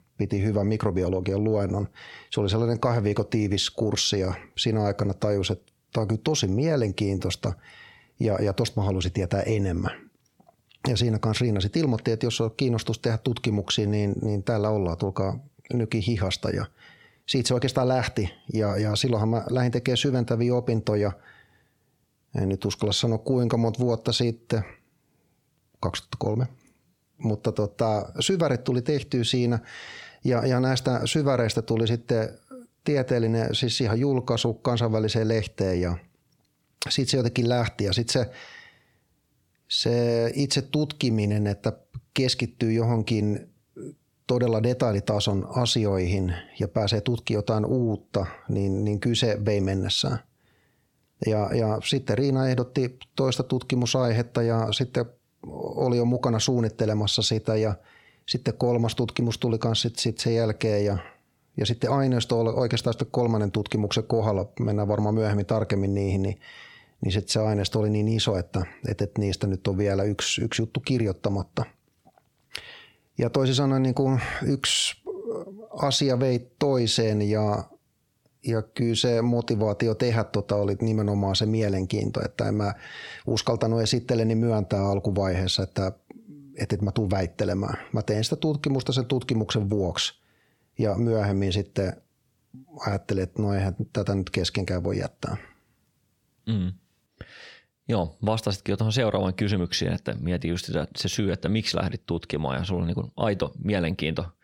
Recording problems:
squashed, flat; heavily

